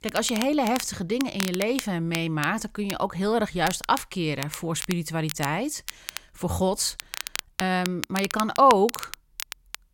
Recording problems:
crackle, like an old record; noticeable; 10 dB below the speech

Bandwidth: 16.5 kHz